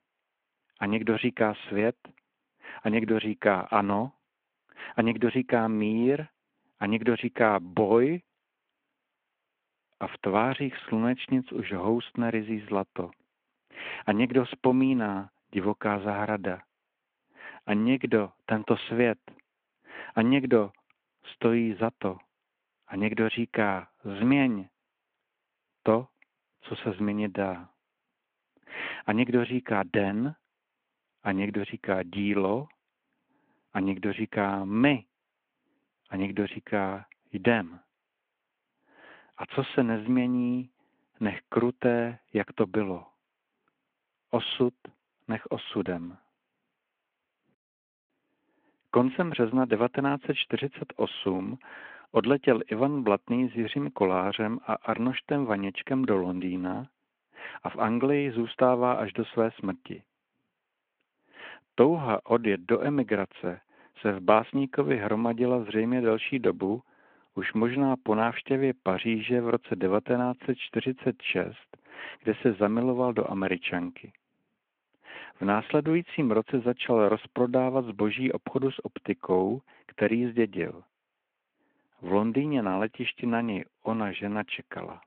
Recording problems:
phone-call audio

